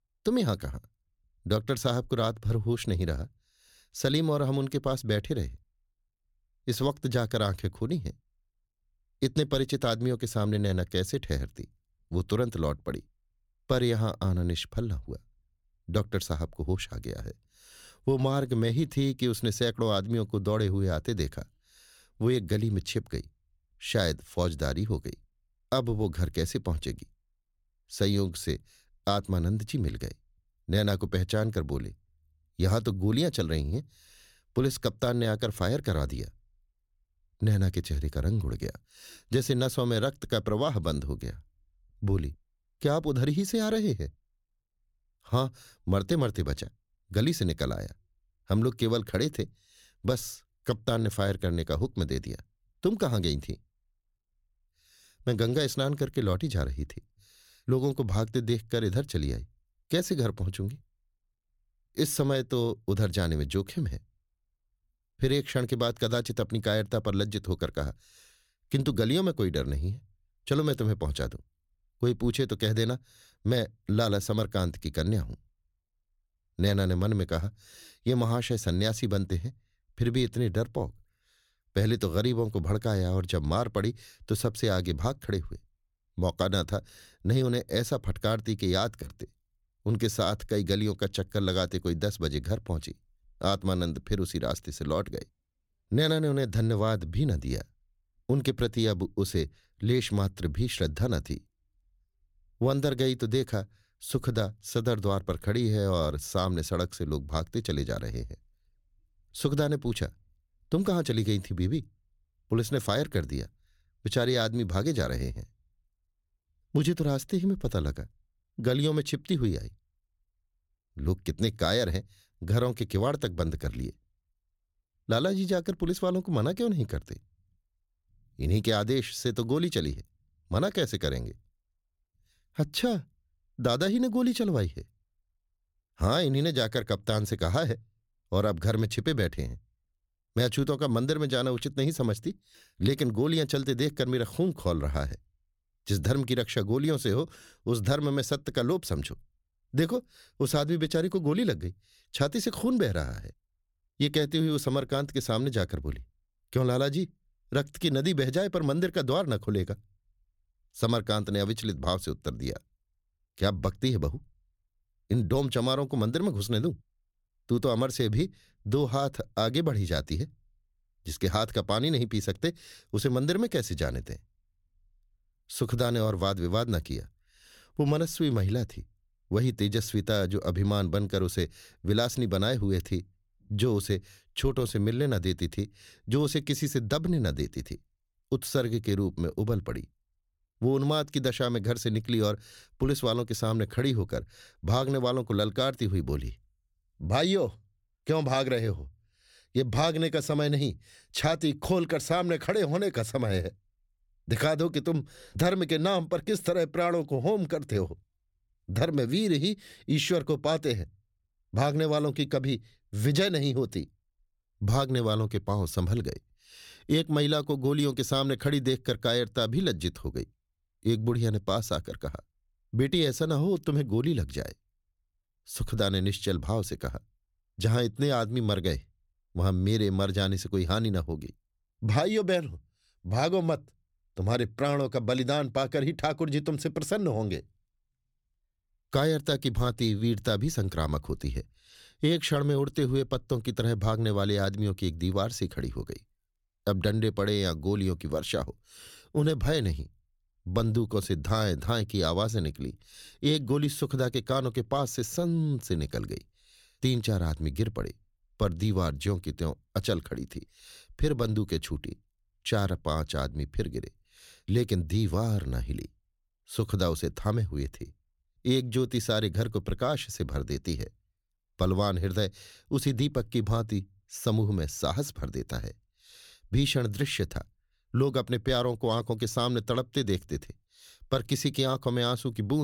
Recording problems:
abrupt cut into speech; at the end

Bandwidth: 17 kHz